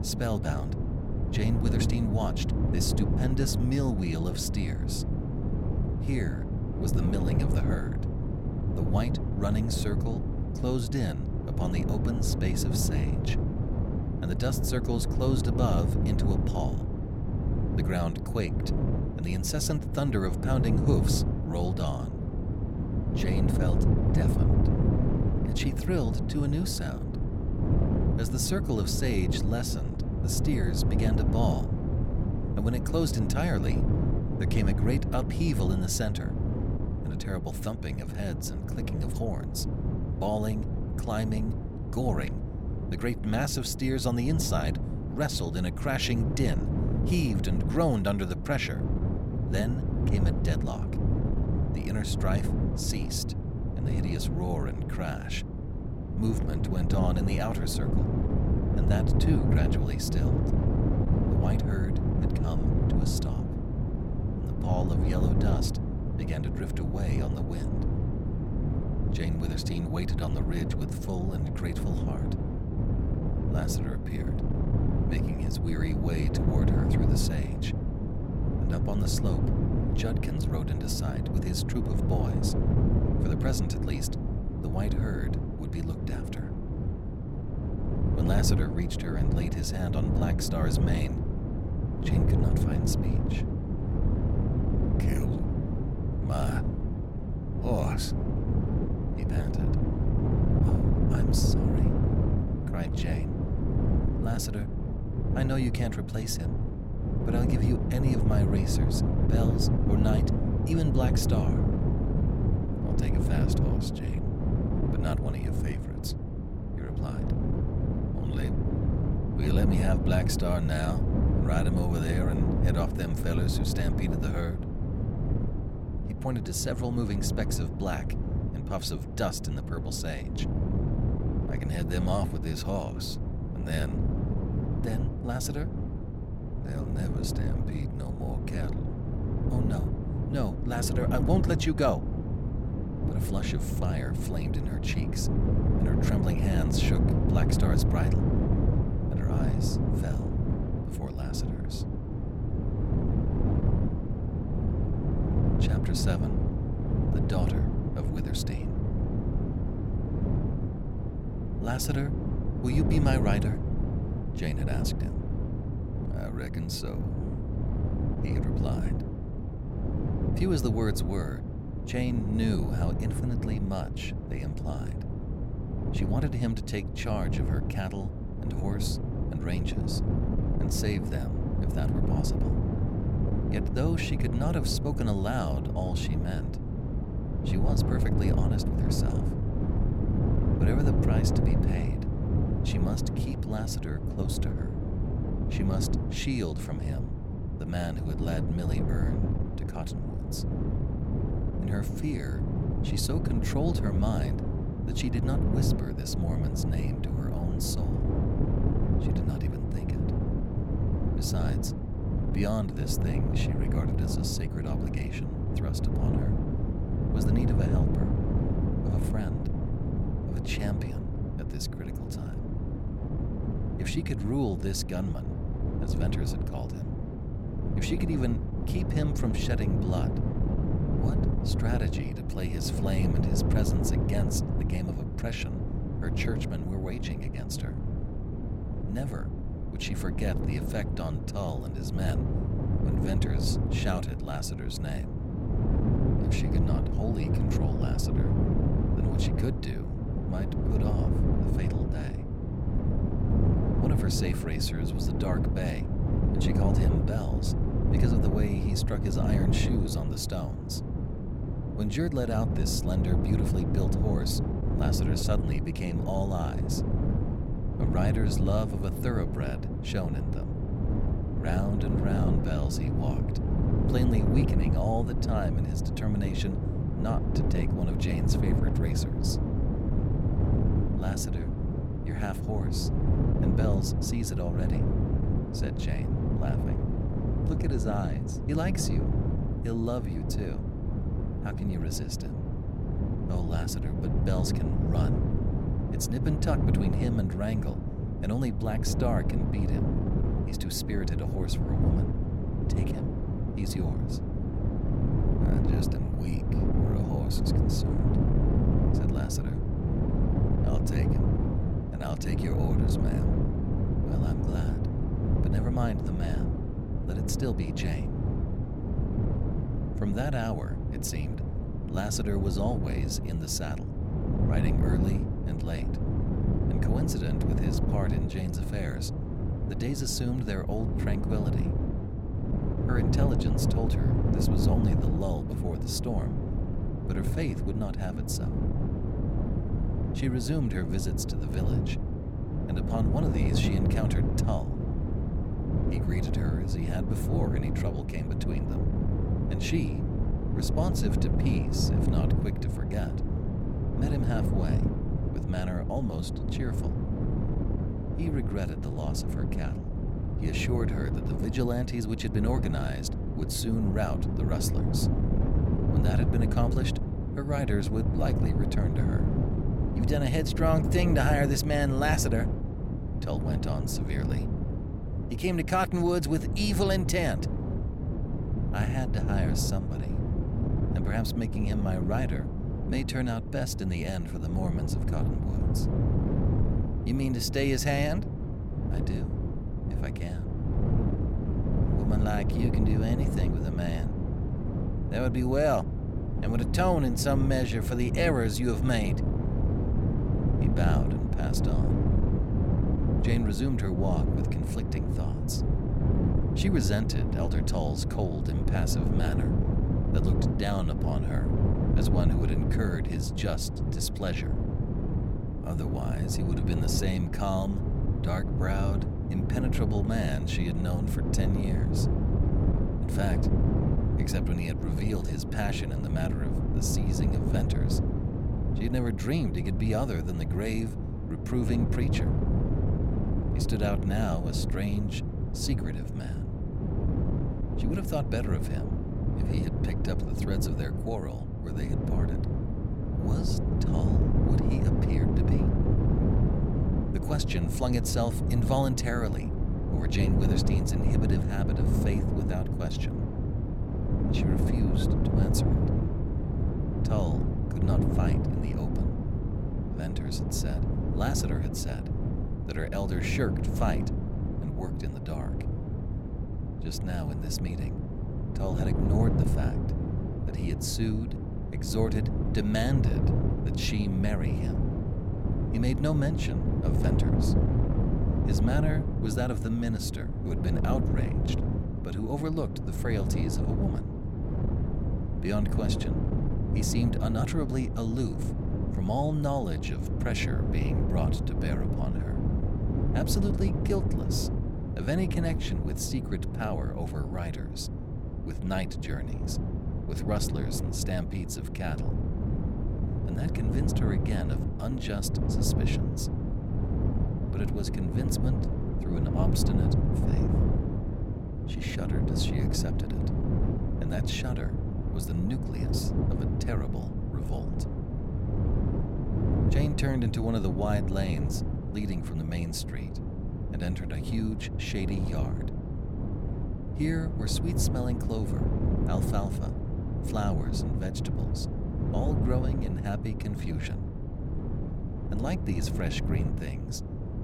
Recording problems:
wind noise on the microphone; heavy; 2 dB below the speech

